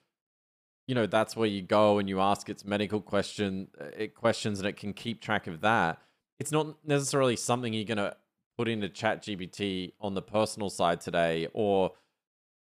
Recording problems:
none

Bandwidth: 15 kHz